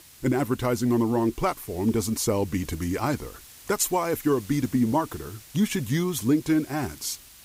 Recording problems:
hiss; noticeable; throughout; 20 dB below the speech

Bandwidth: 15.5 kHz